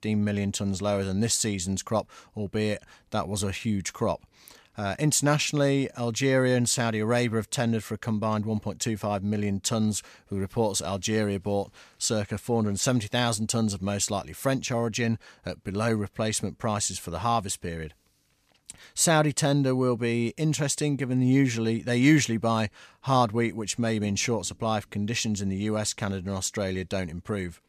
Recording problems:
none

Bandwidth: 14.5 kHz